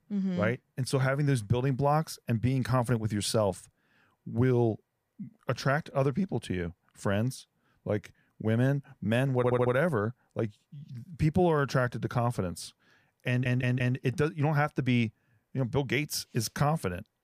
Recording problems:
audio stuttering; at 9.5 s and at 13 s

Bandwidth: 15 kHz